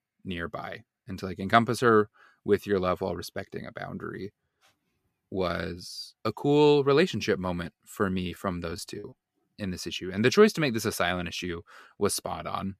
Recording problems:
choppy; very; from 8 to 9 s; 12% of the speech affected

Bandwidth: 14.5 kHz